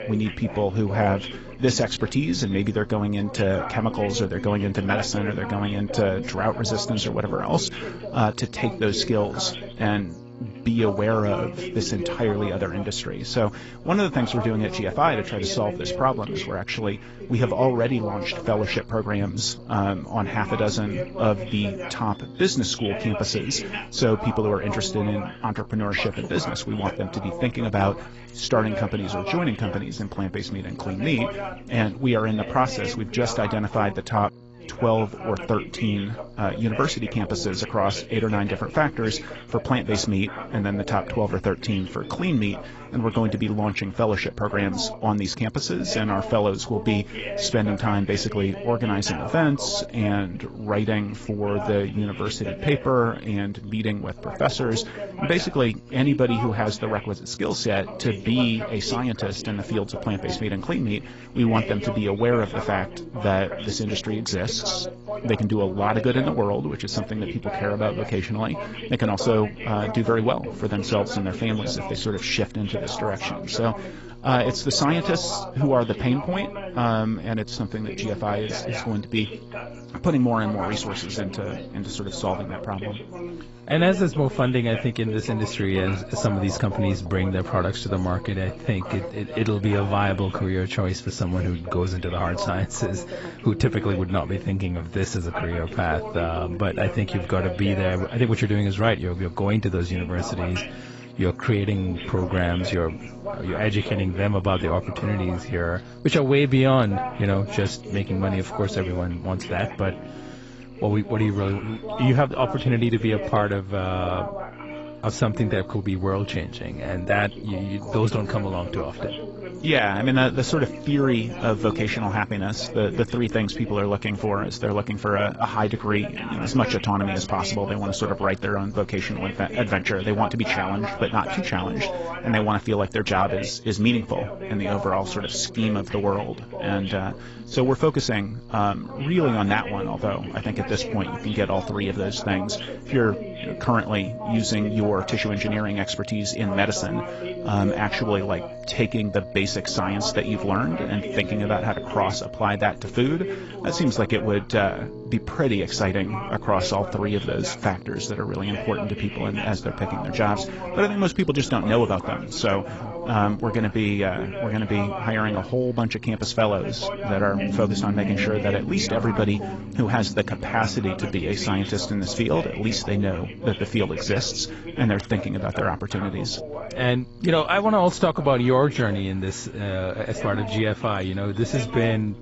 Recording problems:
garbled, watery; badly; nothing above 7.5 kHz
background music; noticeable; throughout; 15 dB below the speech
voice in the background; noticeable; throughout; 10 dB below the speech
electrical hum; faint; throughout; 60 Hz, 20 dB below the speech

